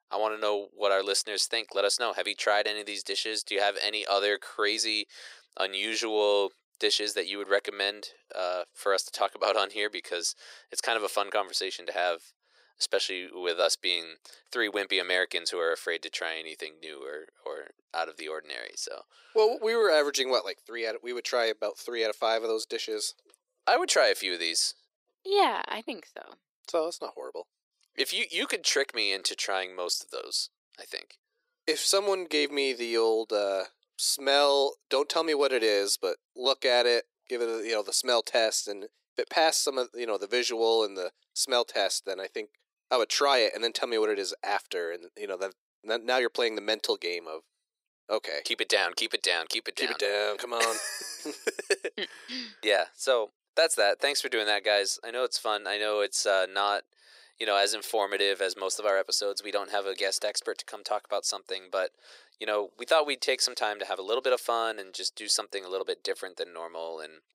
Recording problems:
thin; very; fading below 350 Hz

